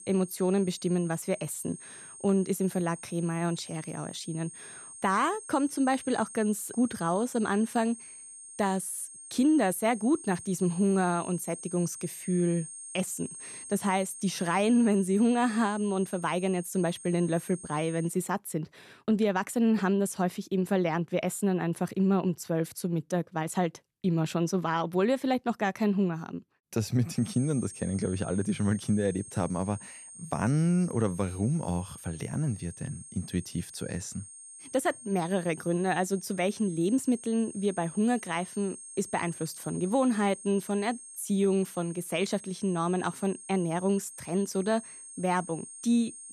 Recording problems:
high-pitched whine; noticeable; until 18 s and from 27 s on; 8.5 kHz, 15 dB below the speech

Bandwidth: 13.5 kHz